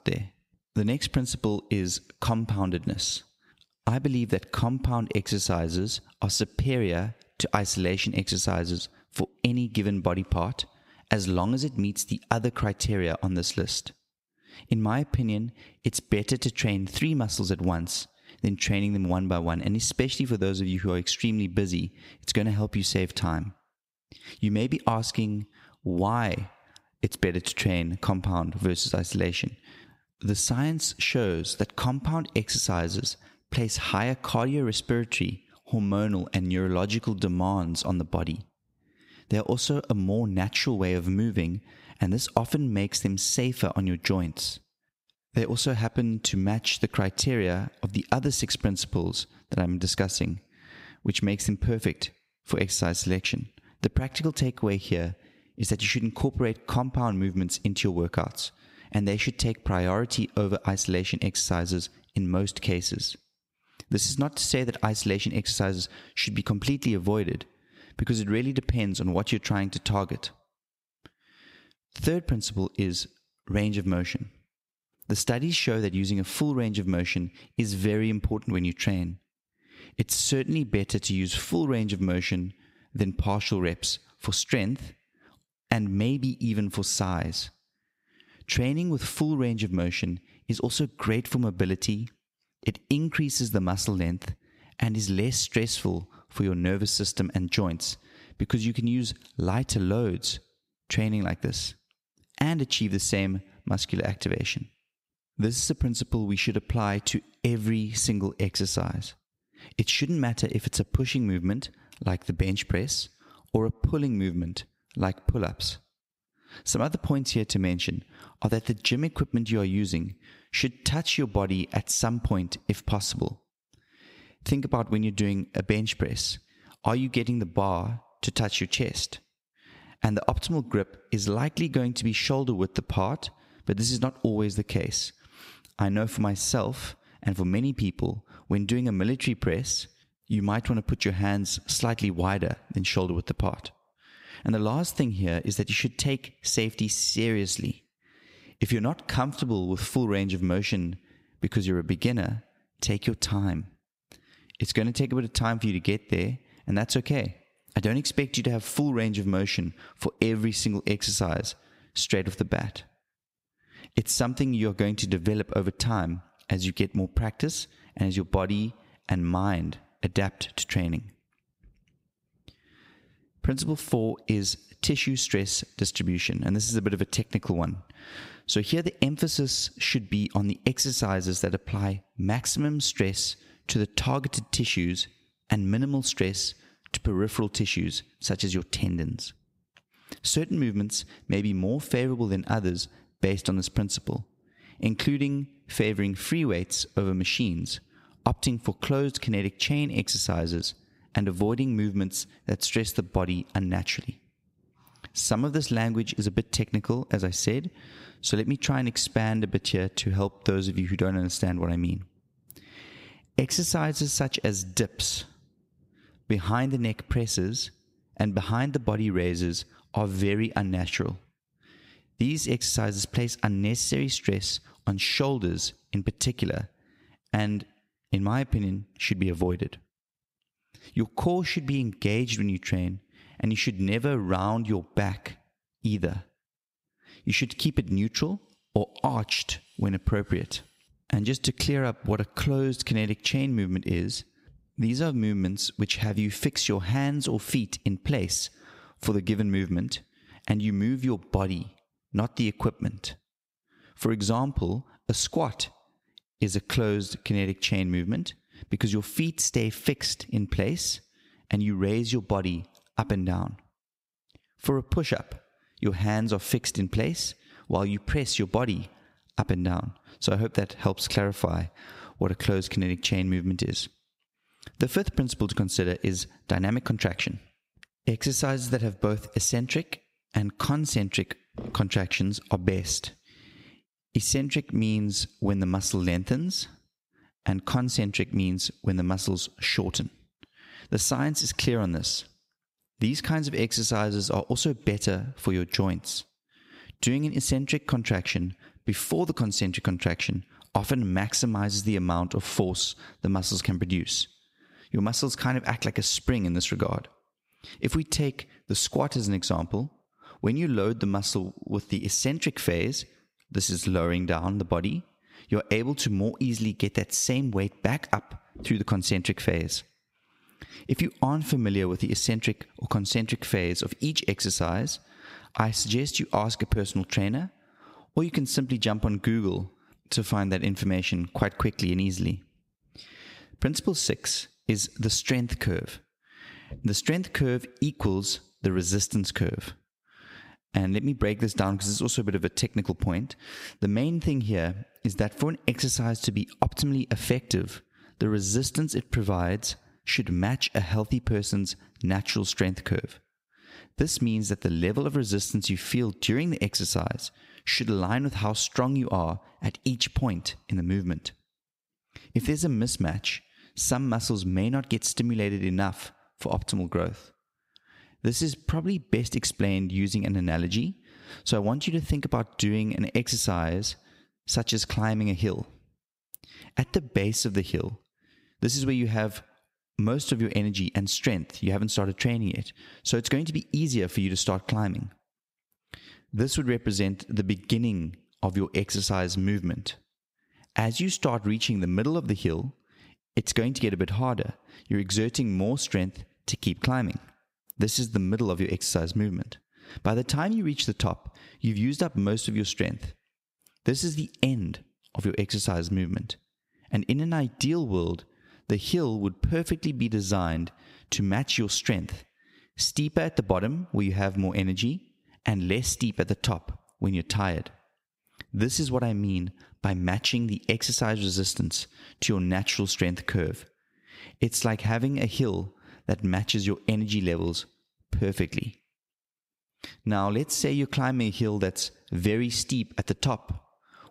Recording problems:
squashed, flat; somewhat

